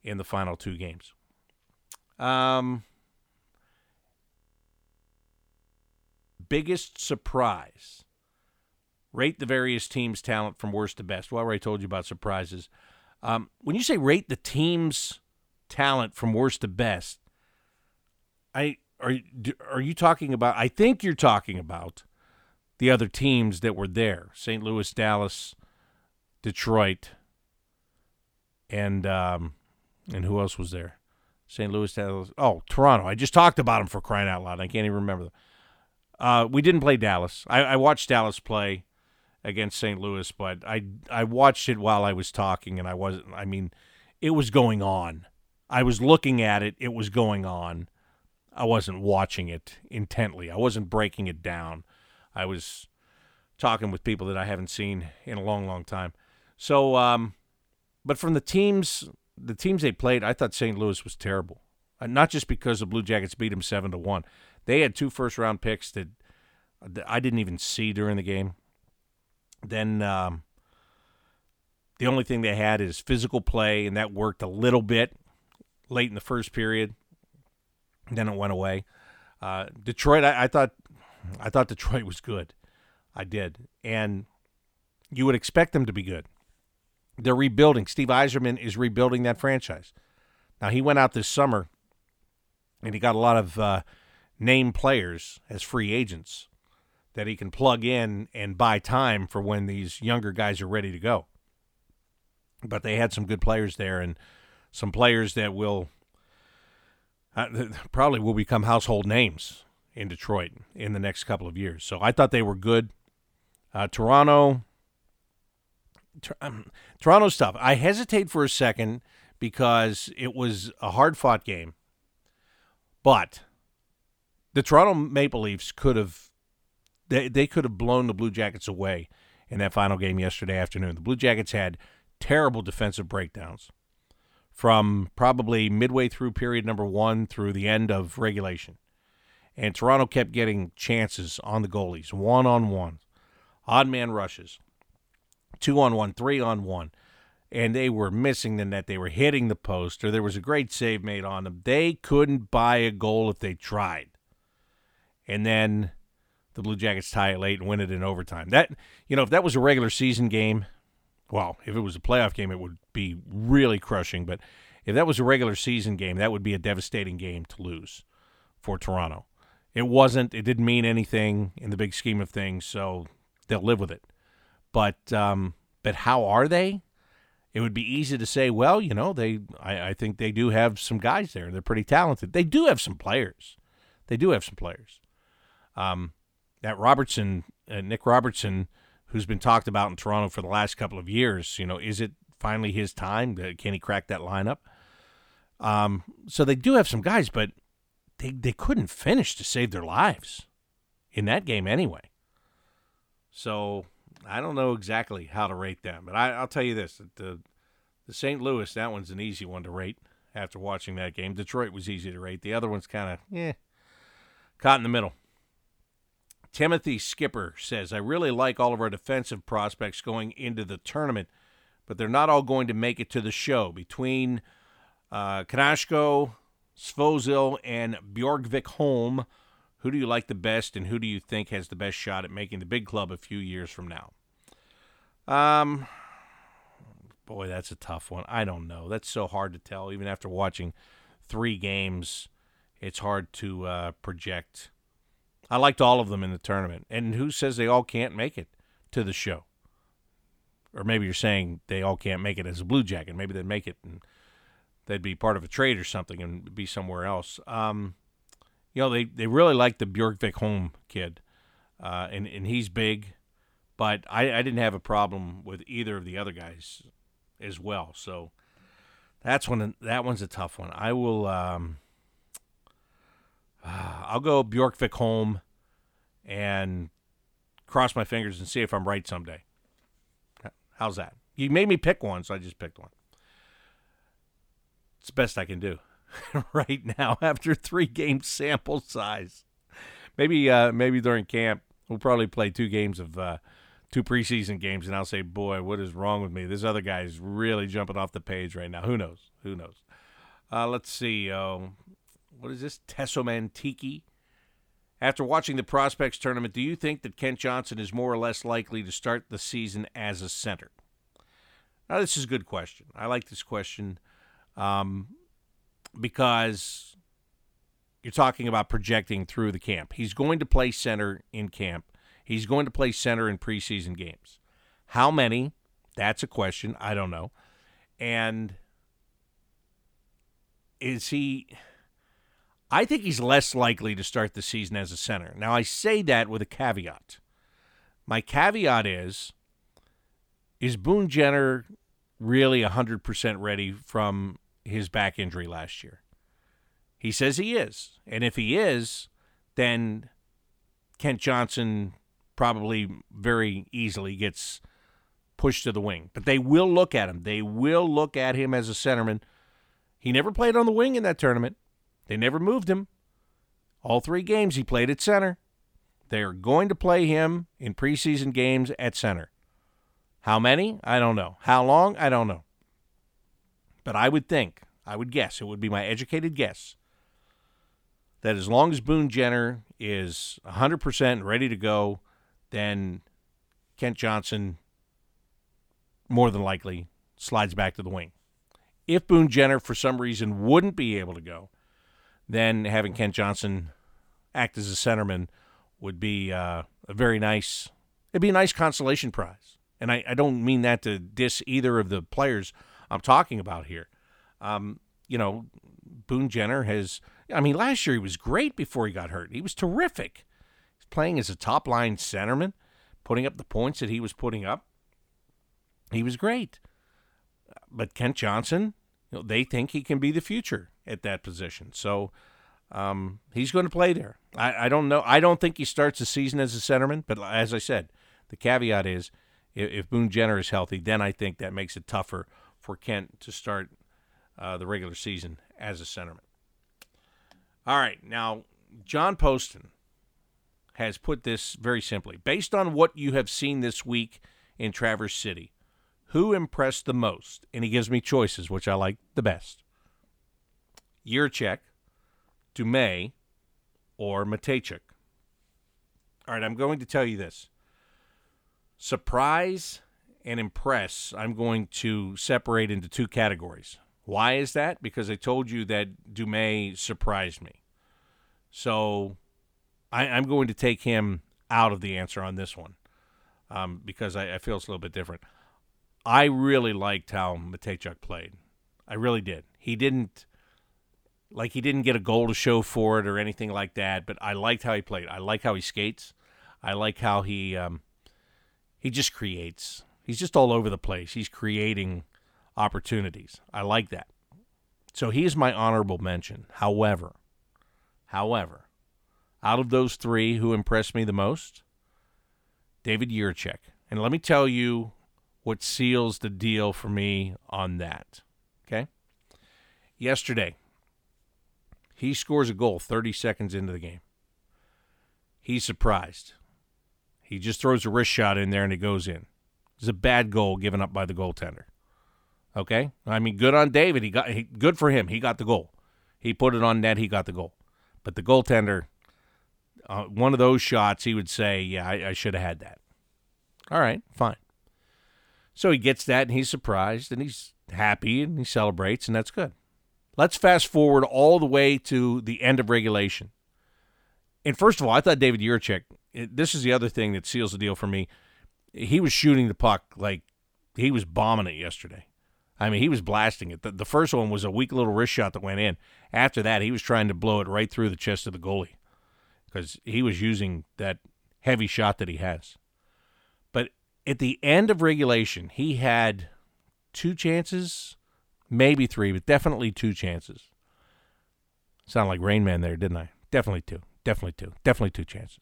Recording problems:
audio freezing; at 4.5 s for 2 s

